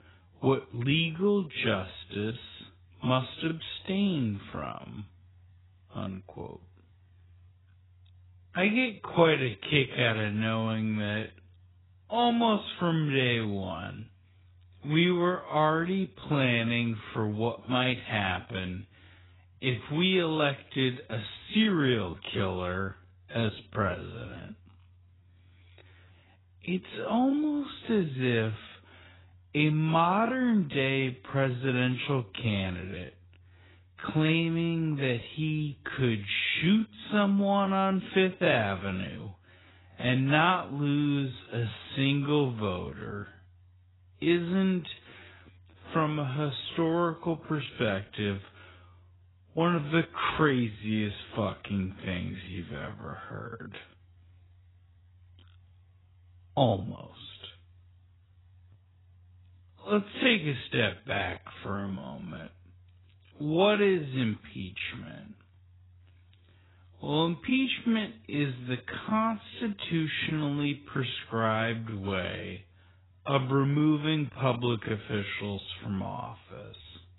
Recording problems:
garbled, watery; badly; nothing above 4 kHz
wrong speed, natural pitch; too slow; 0.5 times normal speed

